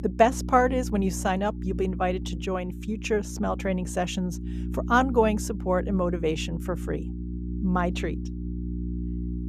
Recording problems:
electrical hum; noticeable; throughout; 60 Hz, 15 dB below the speech

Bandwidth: 14.5 kHz